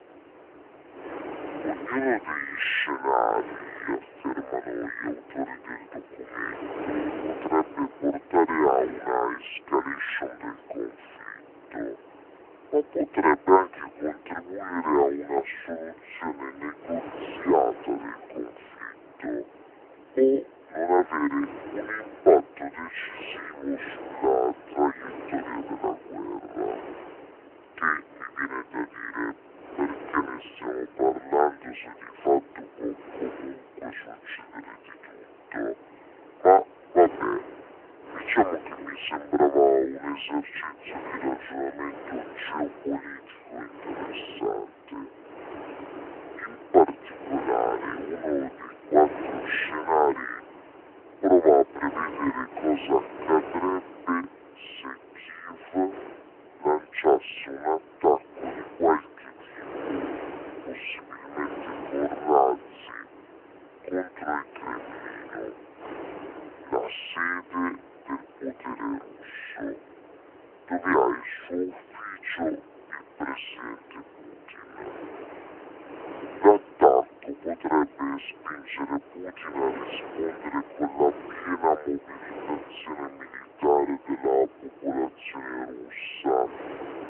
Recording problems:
wrong speed and pitch; too slow and too low; 0.6 times normal speed
phone-call audio; nothing above 3 kHz
wind noise on the microphone; occasional gusts; 15 dB below the speech

